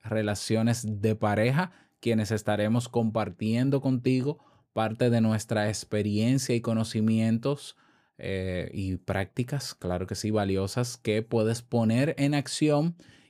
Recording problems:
none

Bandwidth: 15 kHz